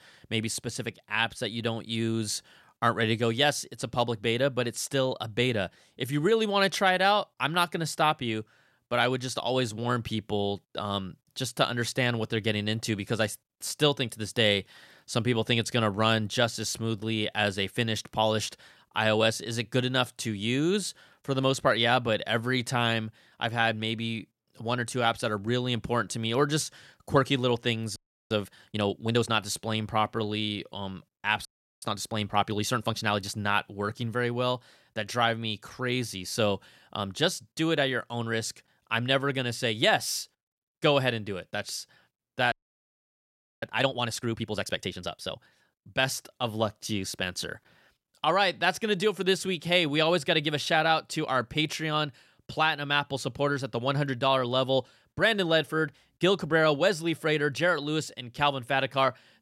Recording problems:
audio freezing; at 28 s, at 31 s and at 43 s for 1 s

